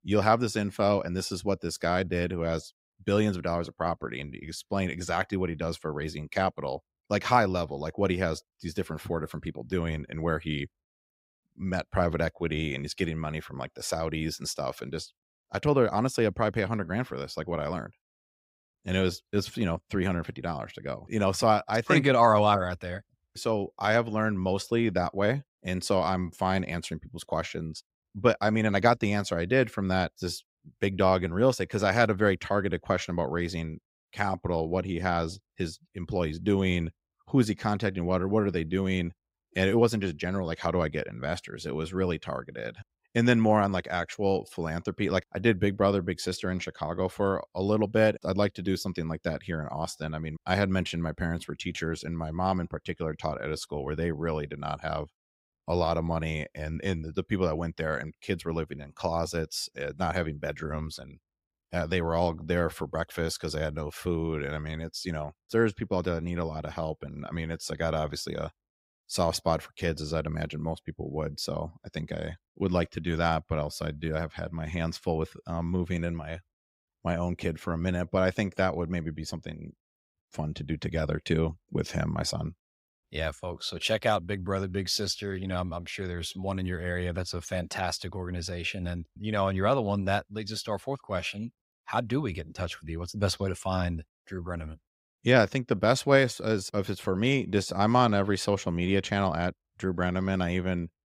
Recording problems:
none

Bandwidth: 15.5 kHz